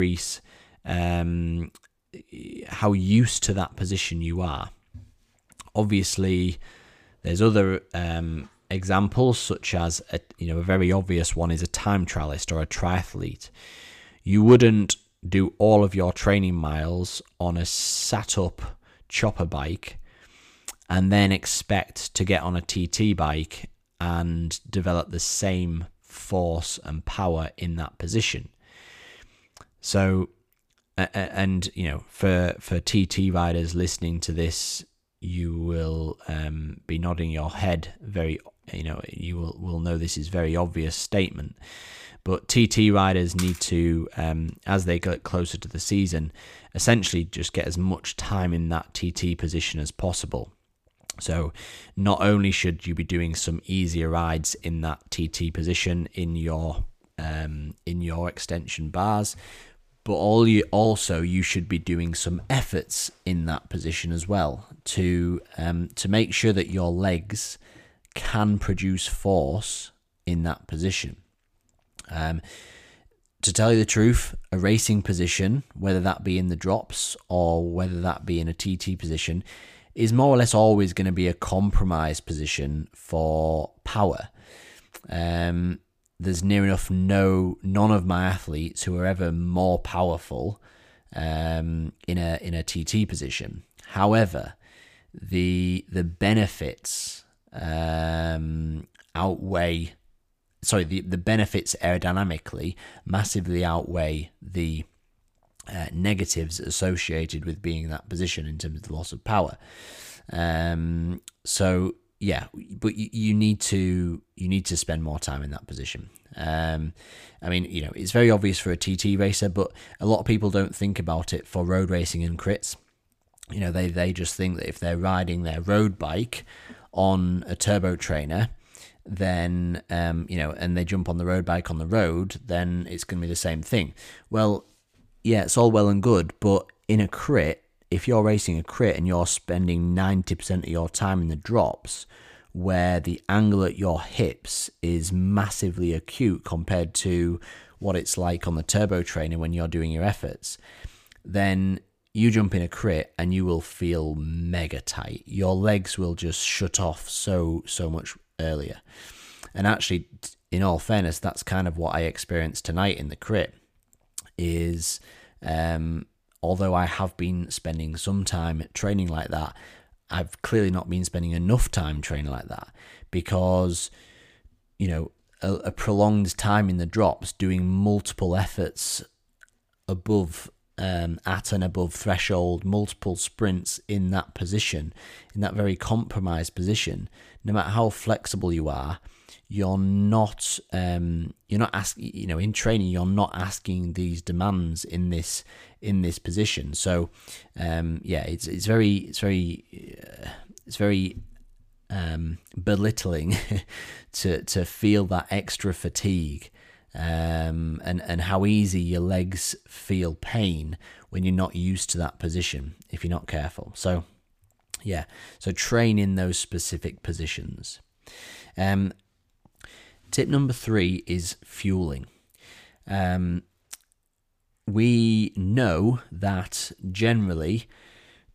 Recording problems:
abrupt cut into speech; at the start

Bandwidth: 15 kHz